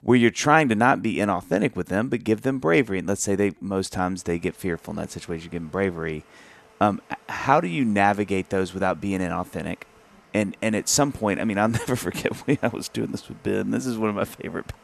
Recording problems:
household noises; faint; from 4 s on; 30 dB below the speech

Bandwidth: 13.5 kHz